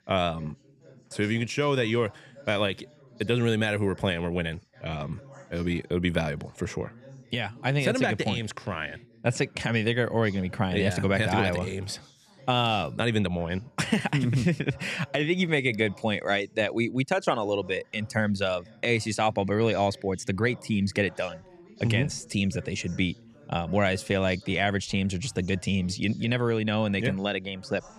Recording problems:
background chatter; faint; throughout; 2 voices, 25 dB below the speech

